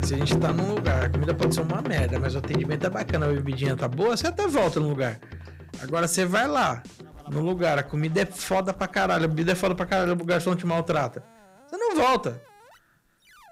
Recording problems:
distortion; slight; 5% of the sound clipped
background music; loud; throughout; 4 dB below the speech

